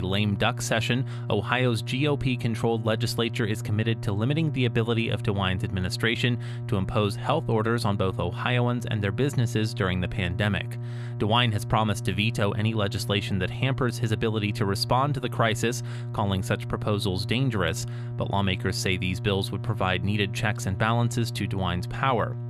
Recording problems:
electrical hum; noticeable; throughout; 60 Hz, 15 dB below the speech
abrupt cut into speech; at the start

